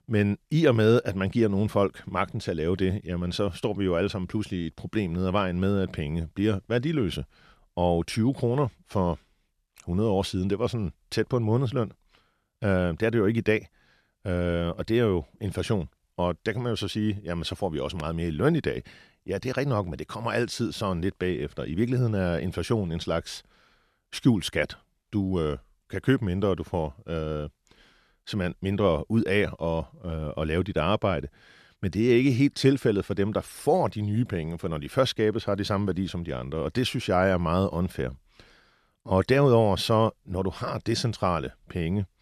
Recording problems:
none

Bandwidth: 13.5 kHz